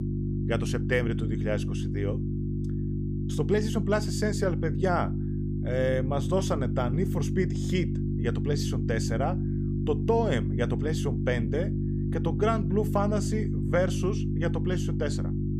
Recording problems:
electrical hum; loud; throughout; 50 Hz, 7 dB below the speech

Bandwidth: 15 kHz